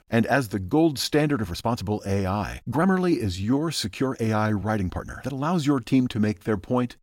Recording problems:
uneven, jittery; strongly; from 1 to 6.5 s

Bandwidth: 16 kHz